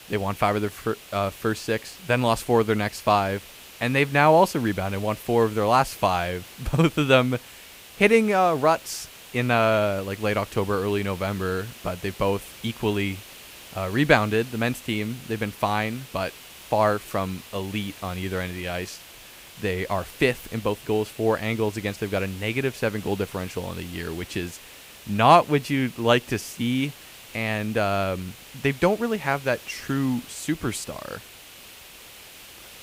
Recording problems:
hiss; noticeable; throughout; 20 dB below the speech

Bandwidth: 15.5 kHz